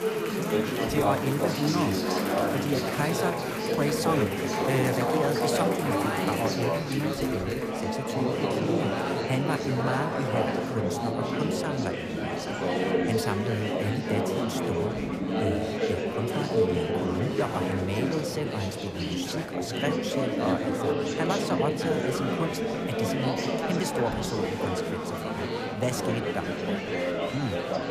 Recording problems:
chatter from many people; very loud; throughout; 4 dB above the speech

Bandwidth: 14.5 kHz